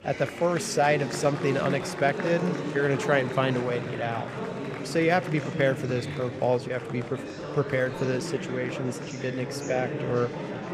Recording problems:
murmuring crowd; loud; throughout; 6 dB below the speech

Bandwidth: 15 kHz